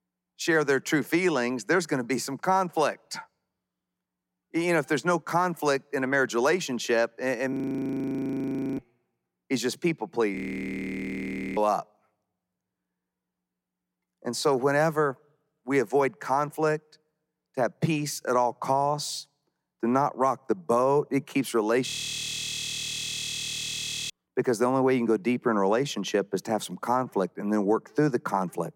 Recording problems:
audio freezing; at 7.5 s for 1 s, at 10 s for 1 s and at 22 s for 2 s

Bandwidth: 16.5 kHz